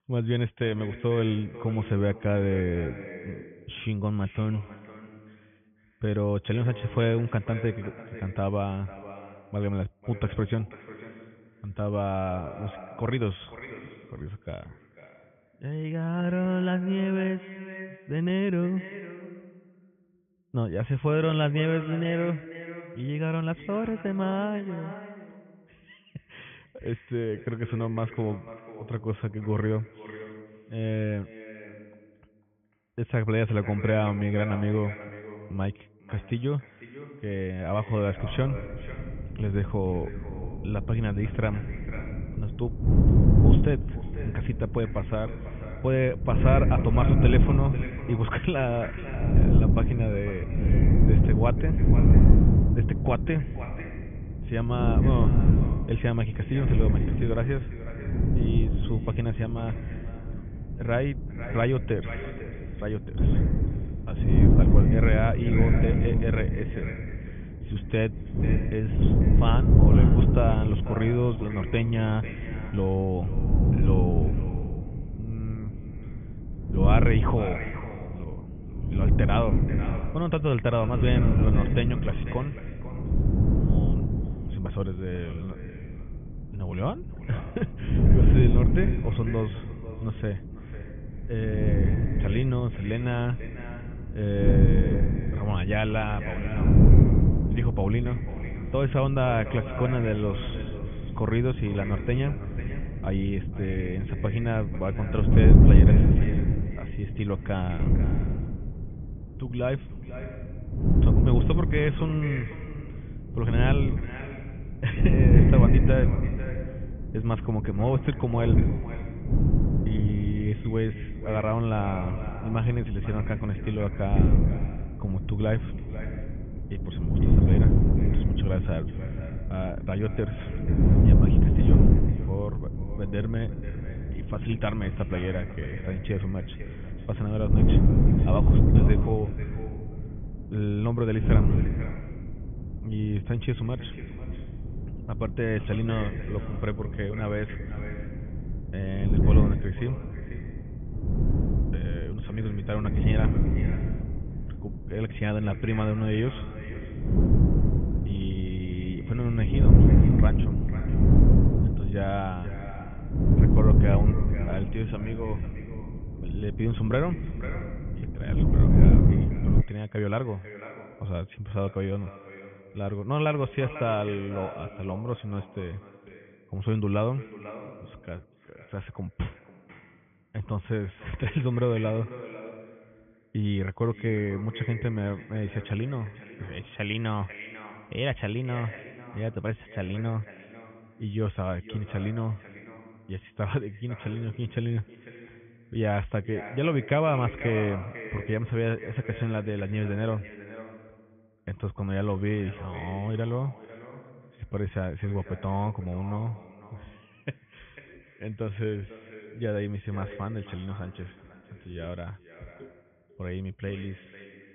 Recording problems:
high frequencies cut off; severe; nothing above 3.5 kHz
echo of what is said; noticeable; throughout; 500 ms later, 15 dB below the speech
muffled; very slightly; fading above 3 kHz
wind noise on the microphone; heavy; from 38 s to 2:50; 2 dB below the speech

